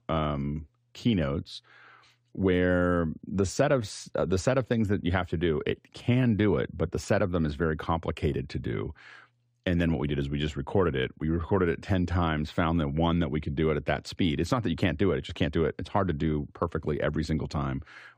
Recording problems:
none

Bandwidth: 15 kHz